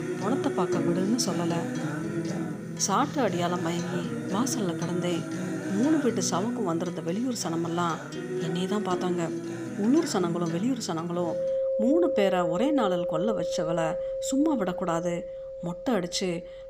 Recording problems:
background music; loud; throughout; 4 dB below the speech

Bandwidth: 15 kHz